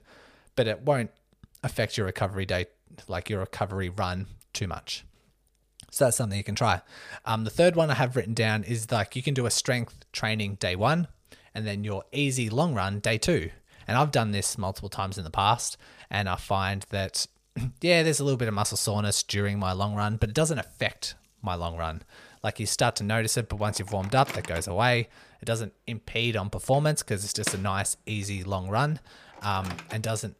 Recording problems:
household noises; noticeable; throughout; 15 dB below the speech

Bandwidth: 15 kHz